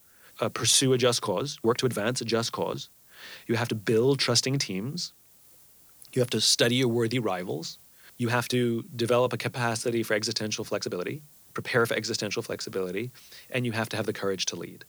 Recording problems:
hiss; faint; throughout; 25 dB below the speech
uneven, jittery; strongly; from 0.5 to 14 s

